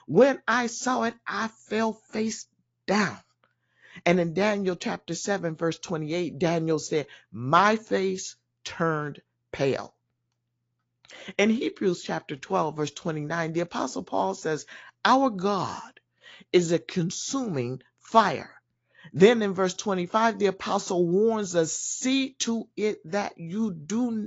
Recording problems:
high frequencies cut off; noticeable; nothing above 7.5 kHz
garbled, watery; slightly
abrupt cut into speech; at the end

